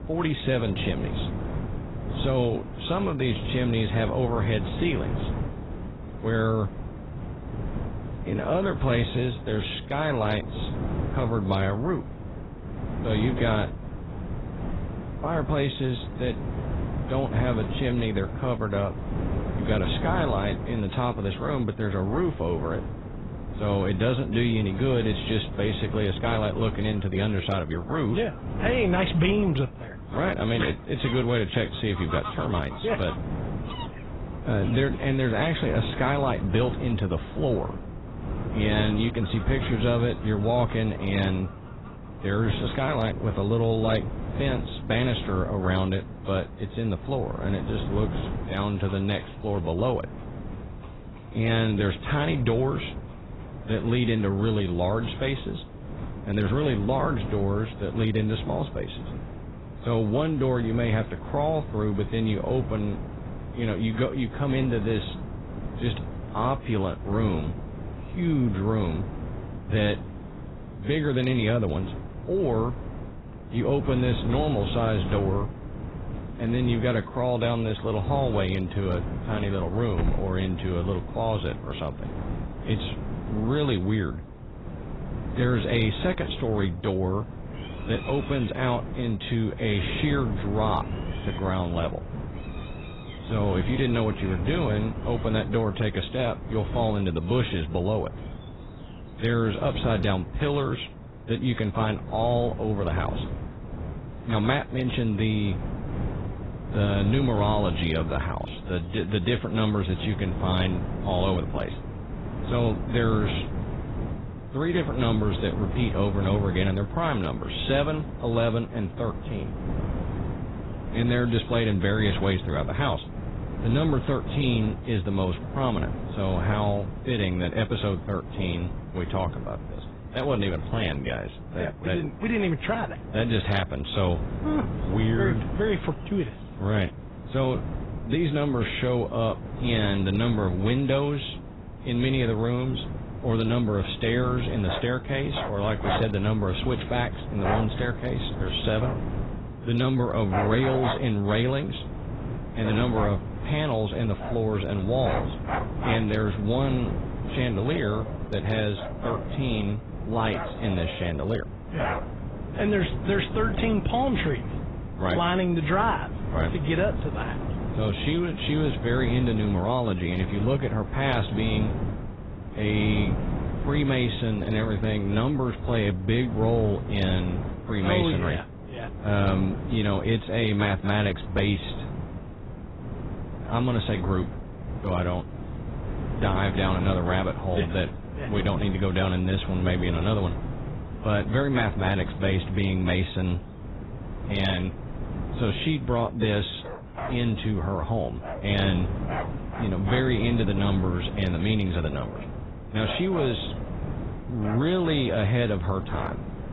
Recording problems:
garbled, watery; badly; nothing above 4 kHz
animal sounds; noticeable; throughout; 15 dB below the speech
wind noise on the microphone; occasional gusts; 10 dB below the speech

